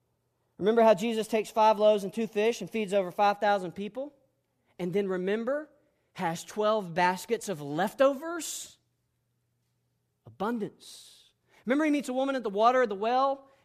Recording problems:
none

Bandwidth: 14.5 kHz